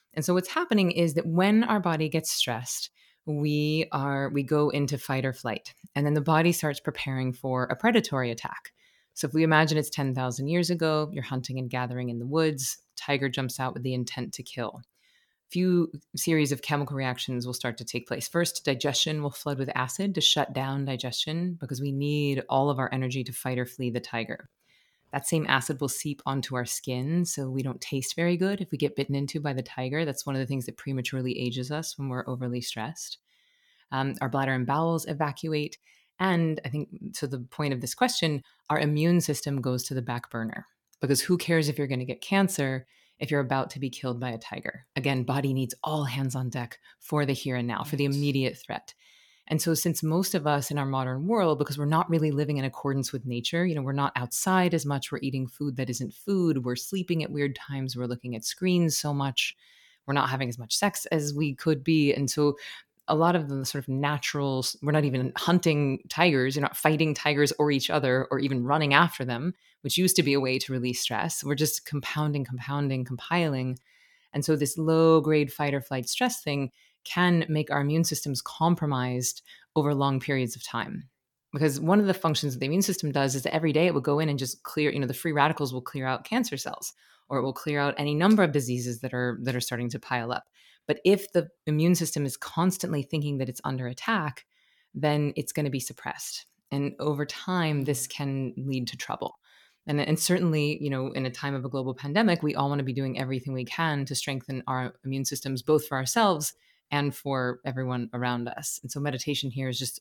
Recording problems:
none

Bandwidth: 18 kHz